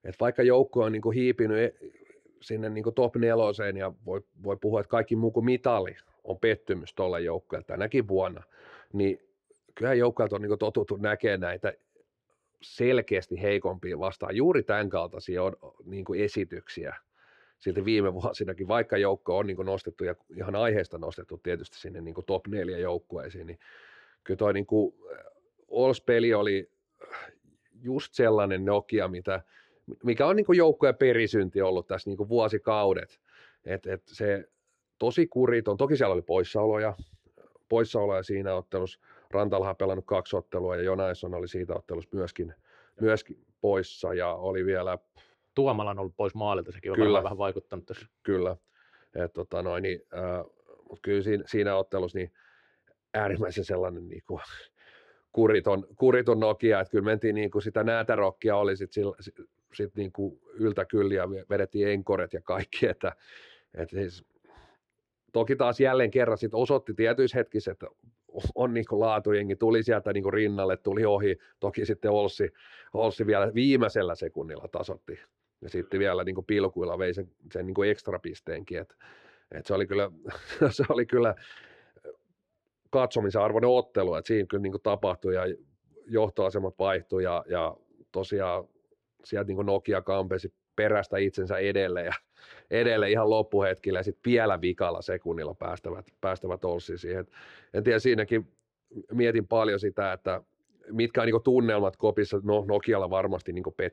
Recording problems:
muffled; very slightly; fading above 3.5 kHz

